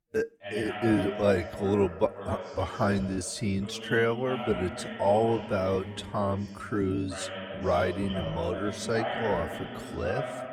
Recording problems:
wrong speed, natural pitch; too slow; 0.7 times normal speed
voice in the background; loud; throughout; 8 dB below the speech

